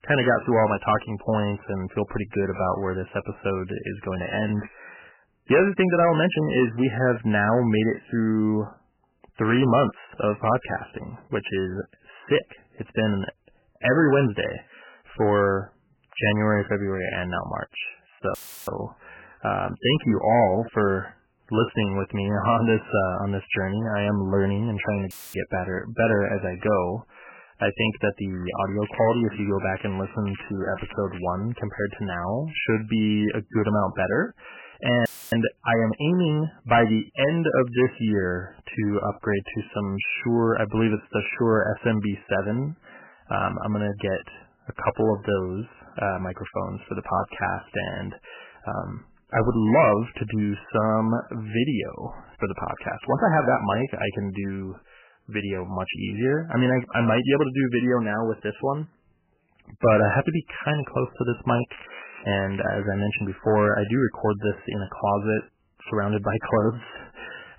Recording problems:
garbled, watery; badly; nothing above 3 kHz
distortion; slight; 2% of the sound clipped
crackling; noticeable; 4 times, first at 2.5 s; 15 dB below the speech
audio cutting out; filled with static; at 18 s, at 25 s and at 35 s

